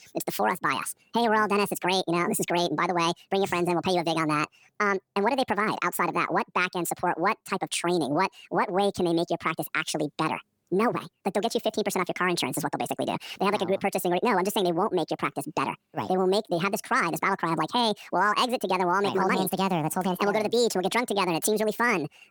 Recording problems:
wrong speed and pitch; too fast and too high; 1.7 times normal speed

